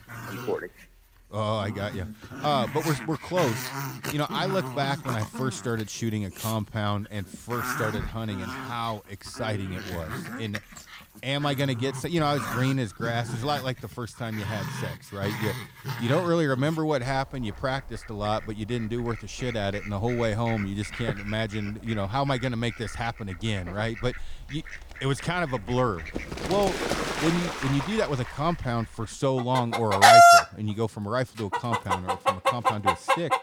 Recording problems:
animal sounds; very loud; throughout; 3 dB above the speech

